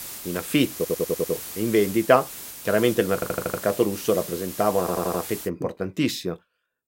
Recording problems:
hiss; noticeable; until 5.5 s; 10 dB below the speech
audio stuttering; at 1 s, at 3 s and at 5 s

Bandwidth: 16 kHz